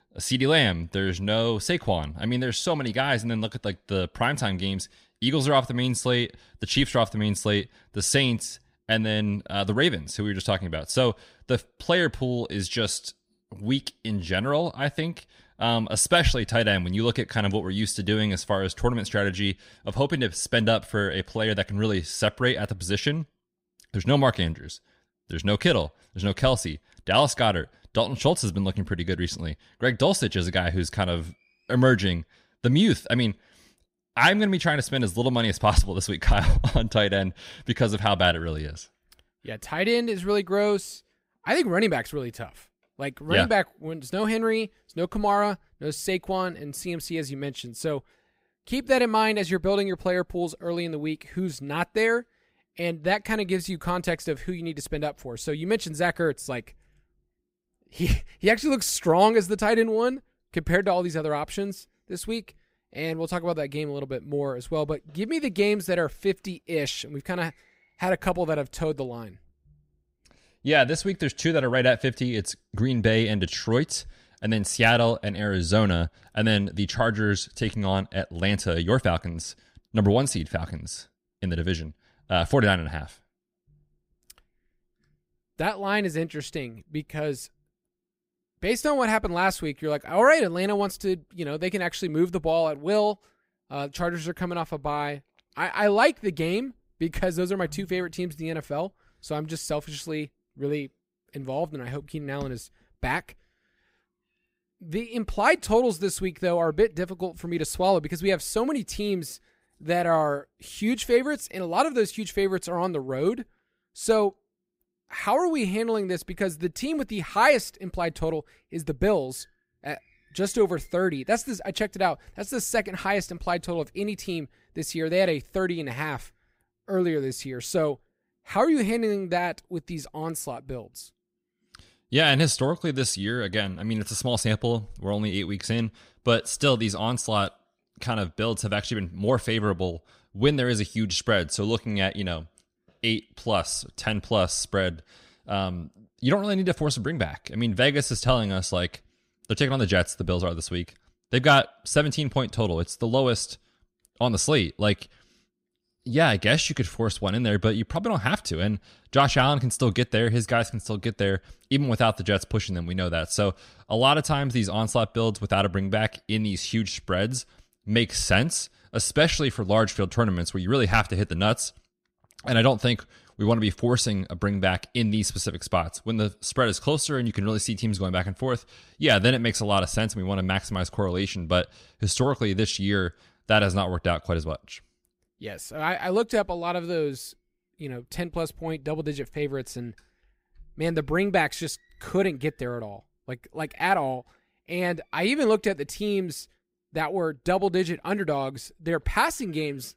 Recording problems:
none

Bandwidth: 15.5 kHz